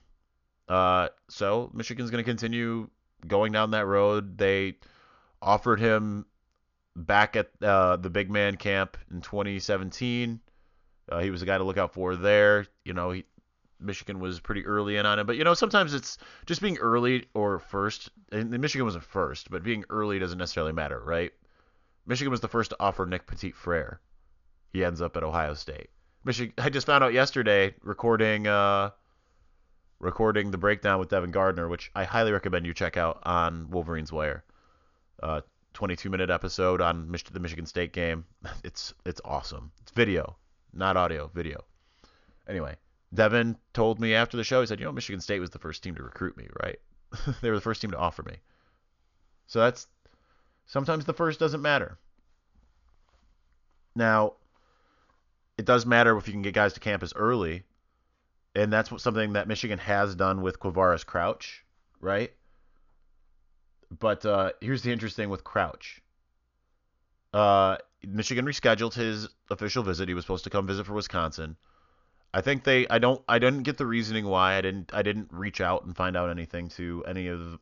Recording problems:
high frequencies cut off; noticeable; nothing above 7 kHz

